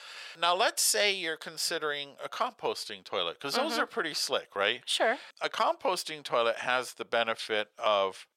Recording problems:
thin; very; fading below 550 Hz

